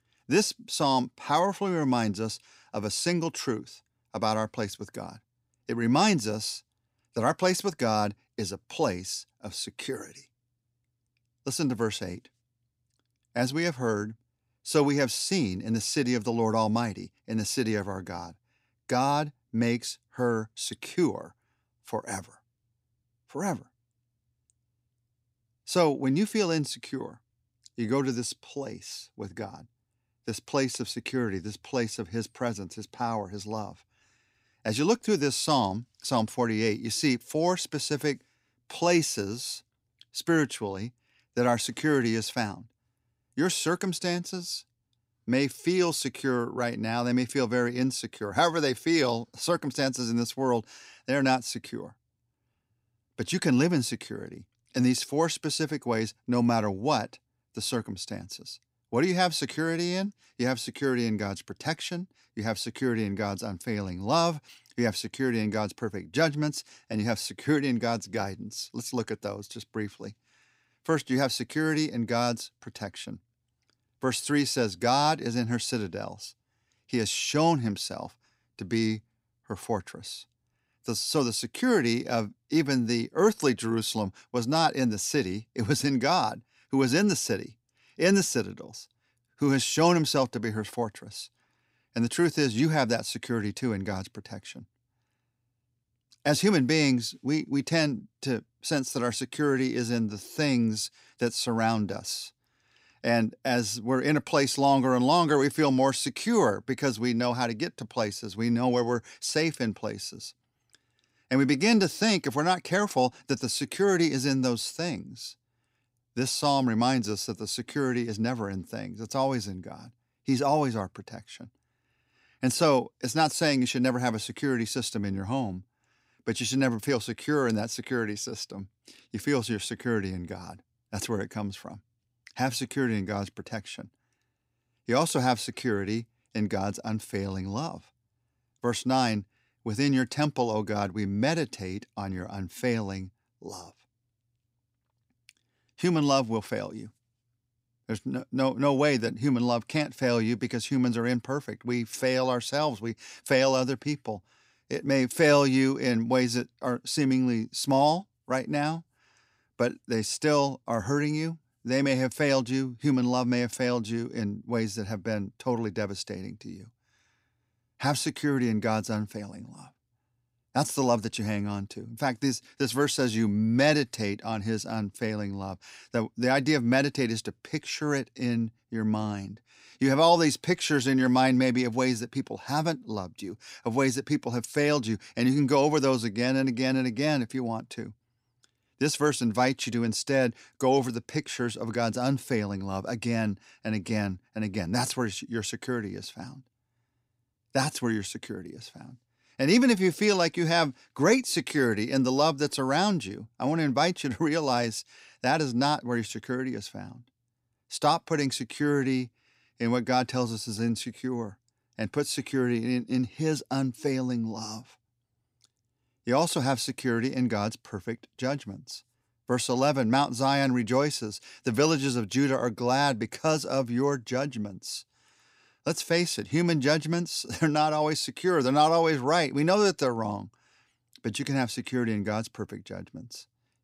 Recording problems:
none

